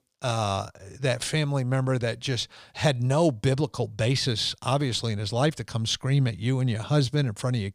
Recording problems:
none

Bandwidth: 15 kHz